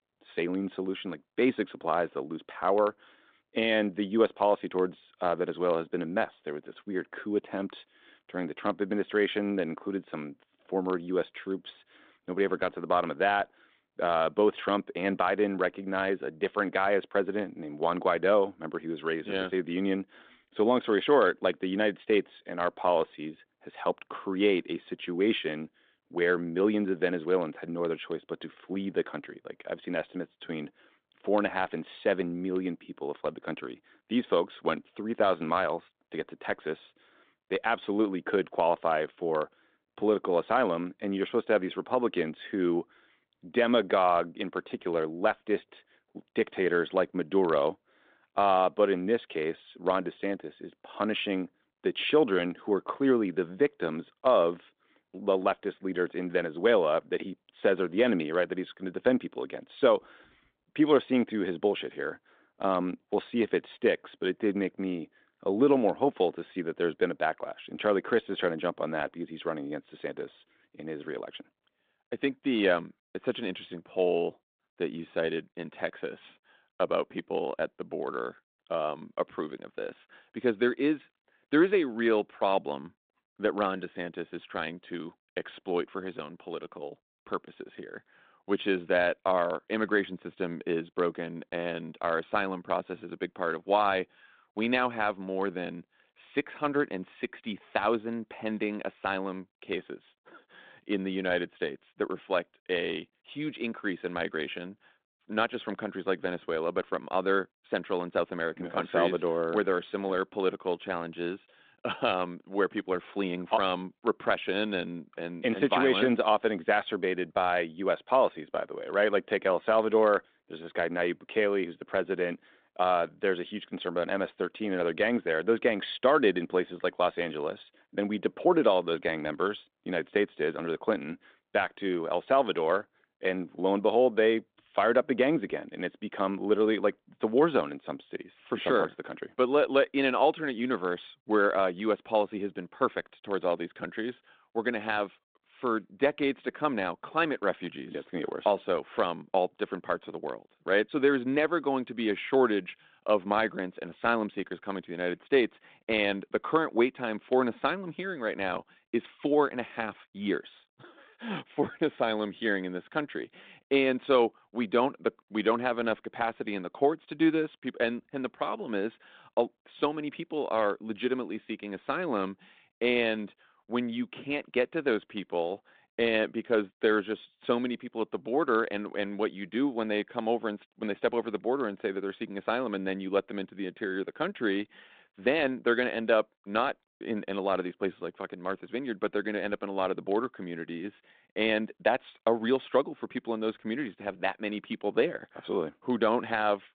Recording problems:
phone-call audio; nothing above 3.5 kHz

